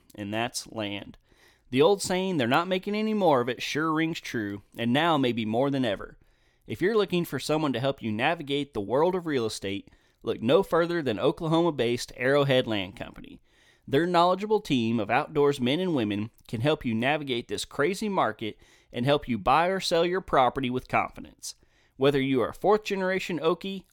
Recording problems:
none

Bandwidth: 18 kHz